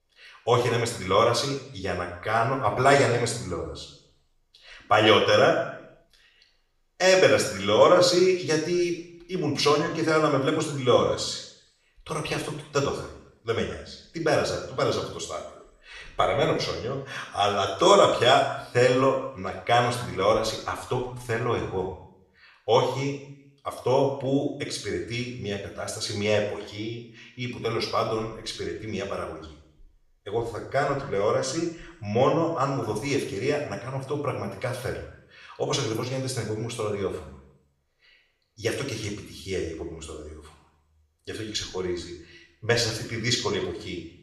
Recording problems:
off-mic speech; far
room echo; noticeable; dies away in 0.7 s

